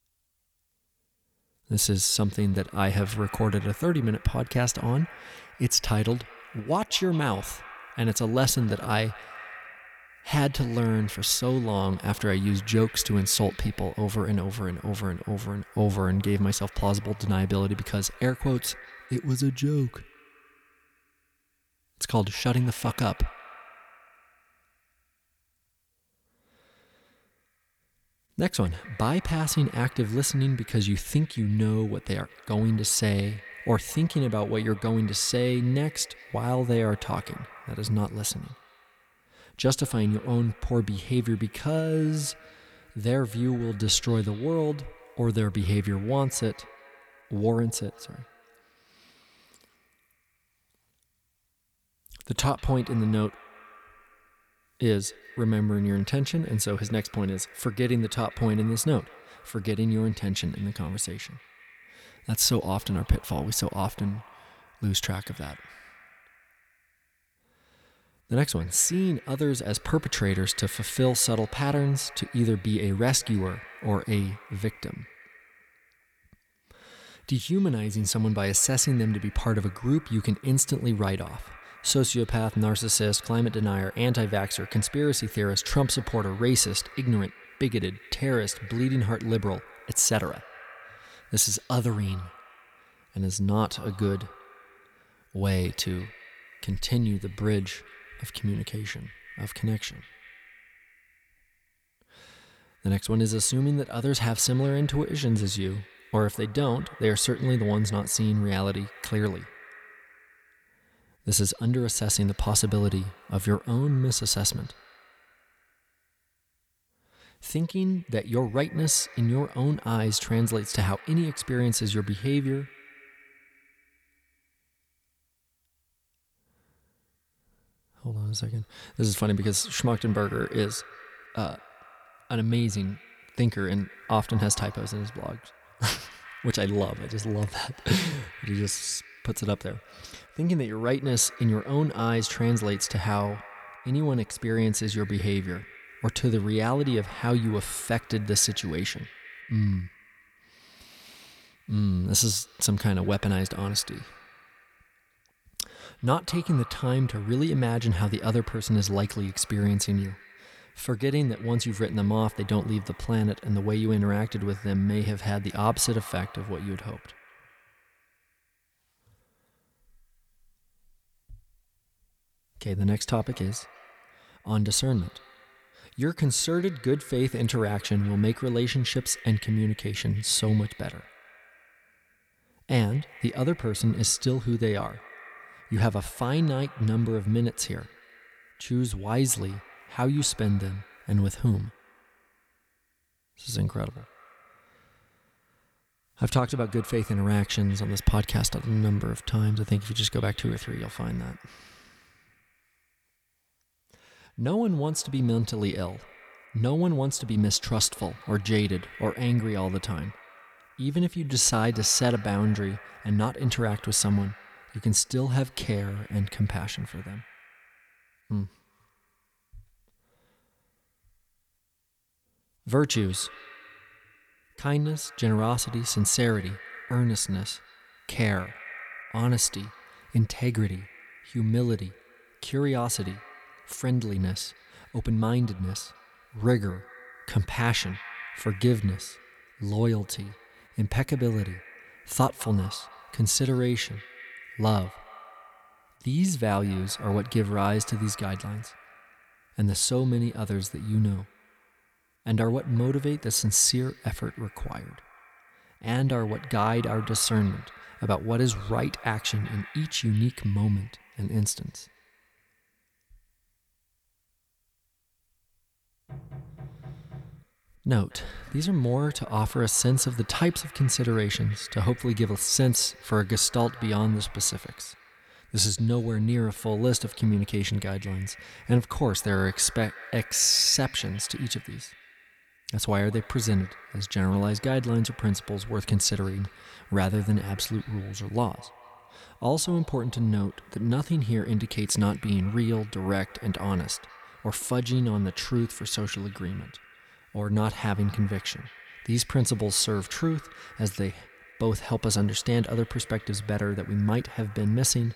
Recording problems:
echo of what is said; faint; throughout; 200 ms later, 20 dB below the speech
door banging; faint; from 4:26 to 4:27; peak 15 dB below the speech

